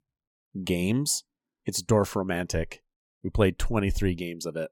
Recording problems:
none

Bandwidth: 17 kHz